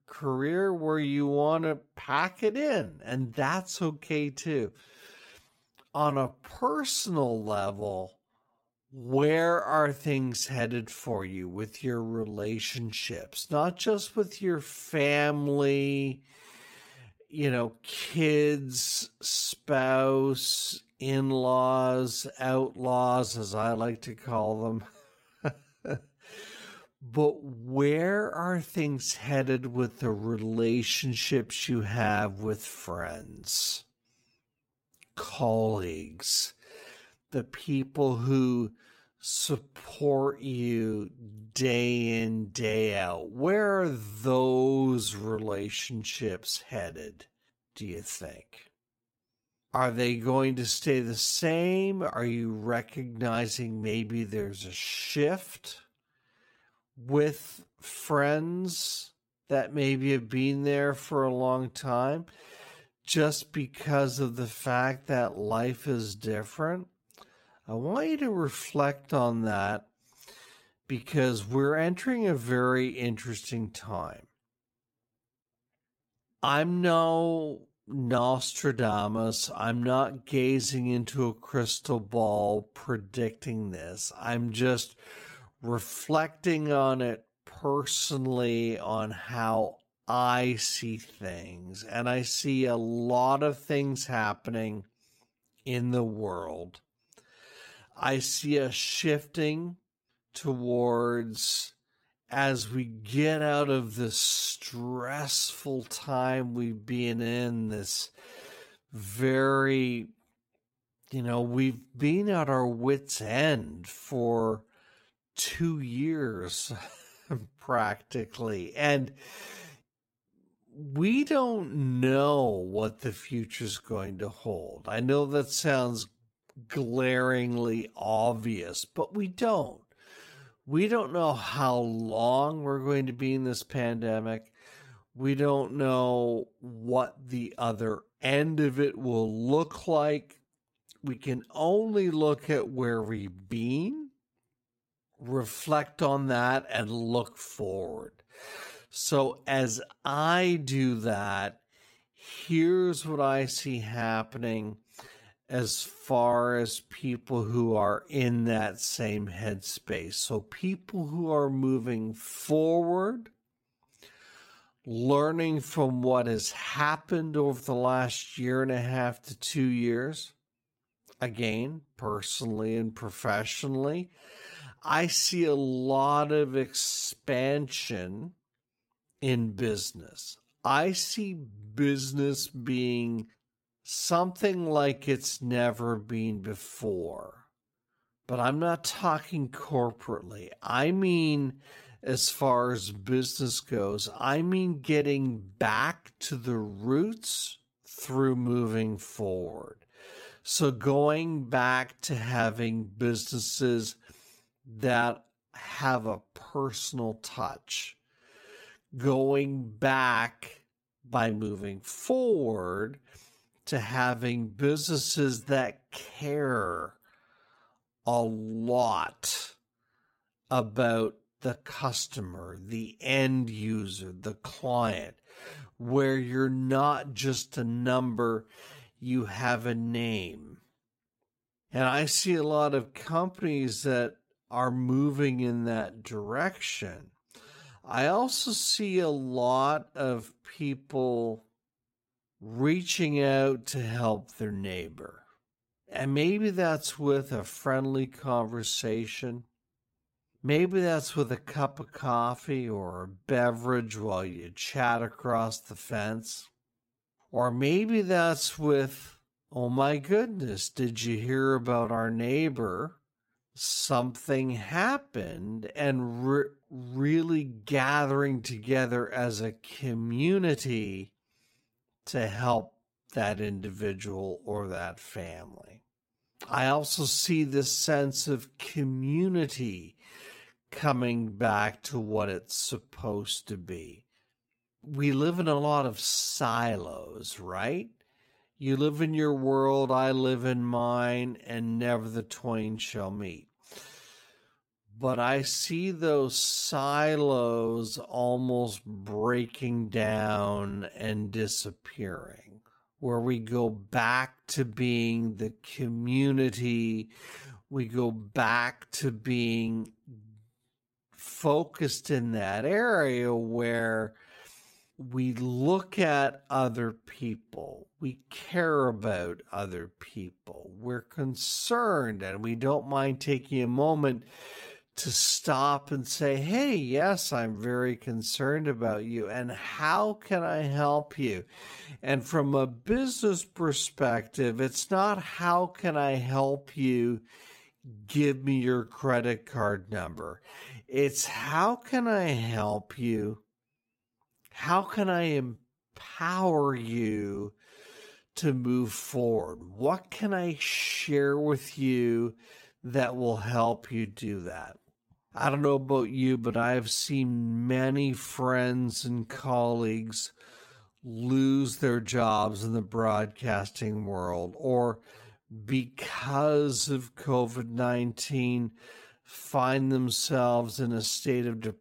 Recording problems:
wrong speed, natural pitch; too slow; 0.6 times normal speed

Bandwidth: 16.5 kHz